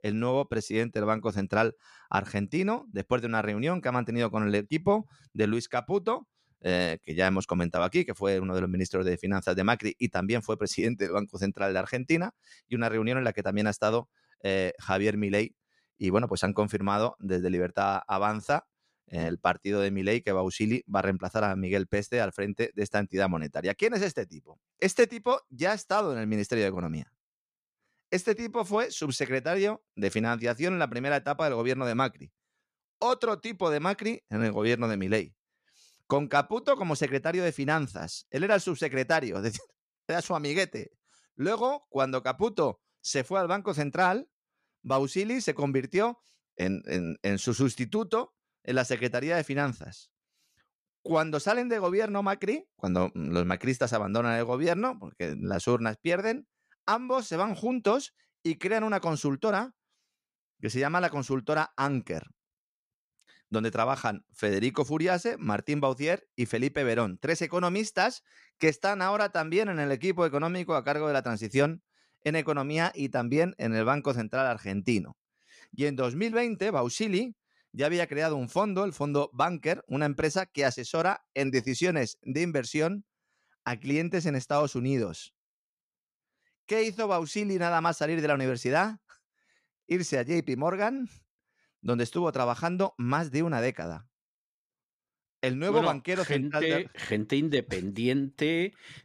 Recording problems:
none

